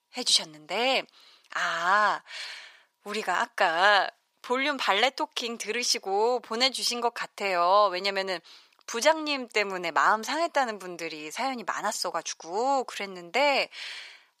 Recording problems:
thin; very; fading below 600 Hz

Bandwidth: 15 kHz